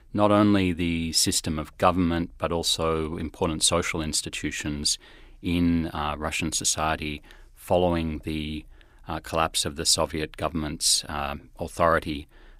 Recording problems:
none

